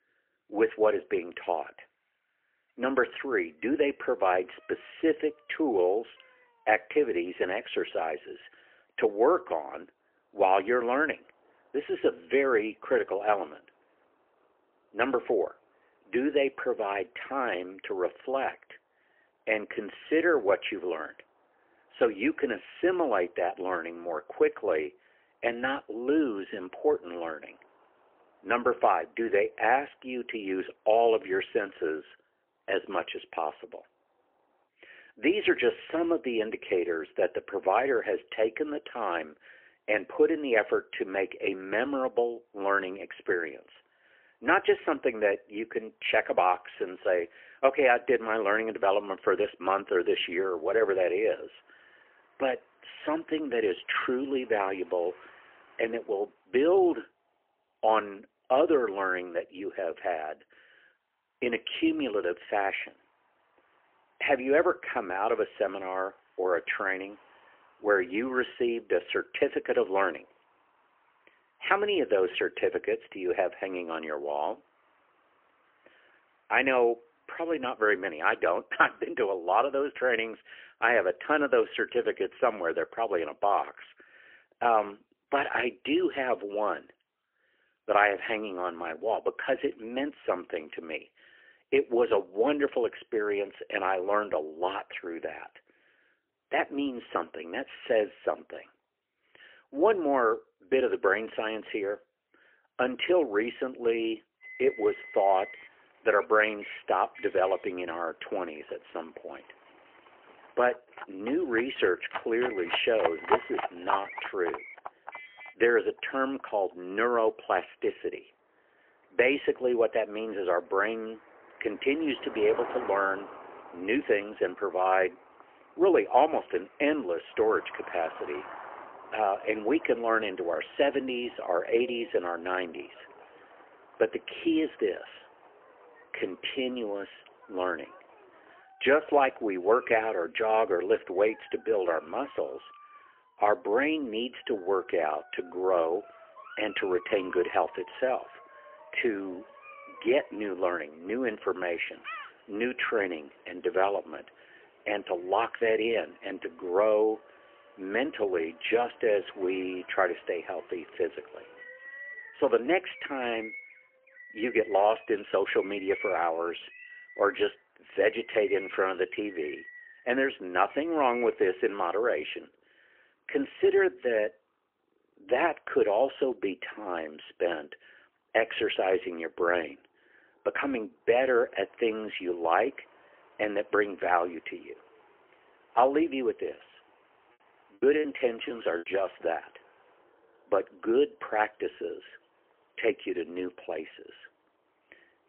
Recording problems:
phone-call audio; poor line; nothing above 3 kHz
animal sounds; noticeable; from 1:45 on; 15 dB below the speech
traffic noise; faint; throughout; 30 dB below the speech
choppy; very; from 3:08 to 3:09; 11% of the speech affected

